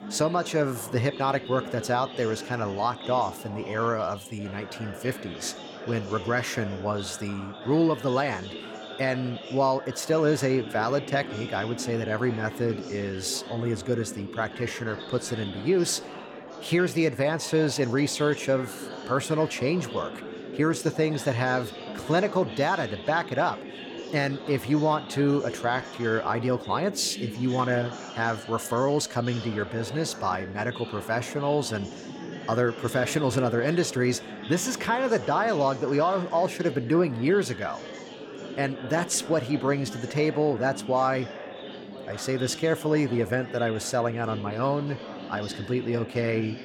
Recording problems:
chatter from many people; noticeable; throughout; 10 dB below the speech

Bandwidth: 17.5 kHz